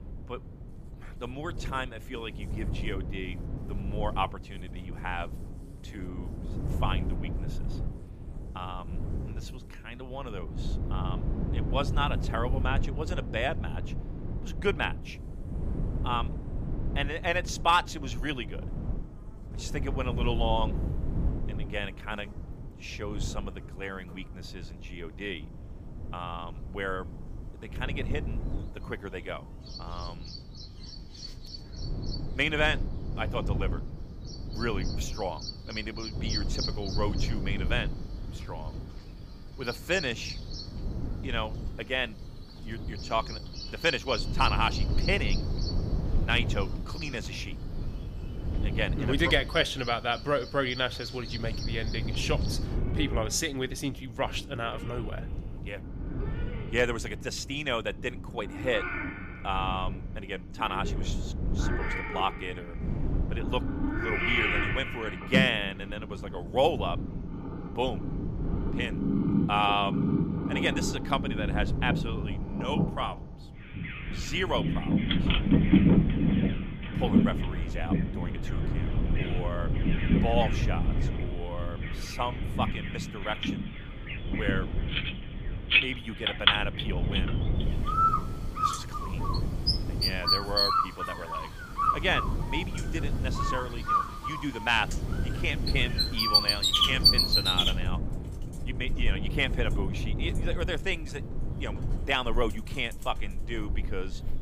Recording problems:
animal sounds; very loud; throughout; 2 dB above the speech
wind noise on the microphone; occasional gusts; 15 dB below the speech

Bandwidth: 15 kHz